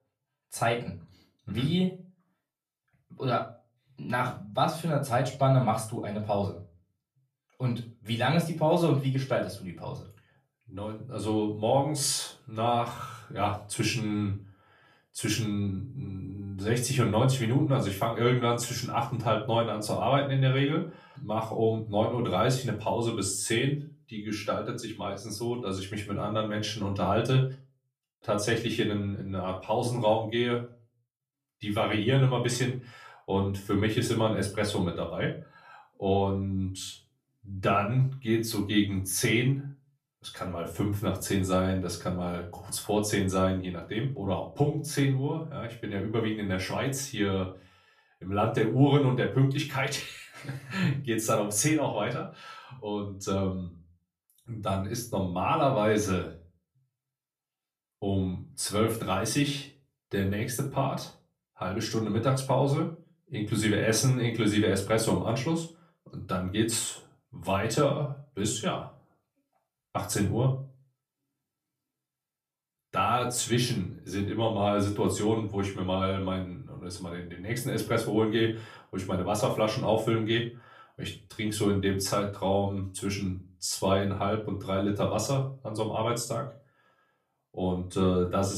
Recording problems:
off-mic speech; far
room echo; slight; dies away in 0.3 s
abrupt cut into speech; at the end

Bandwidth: 14.5 kHz